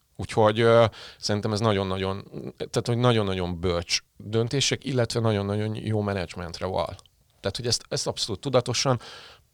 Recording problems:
none

